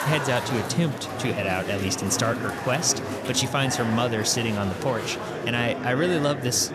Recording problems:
murmuring crowd; loud; throughout; 6 dB below the speech

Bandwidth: 14 kHz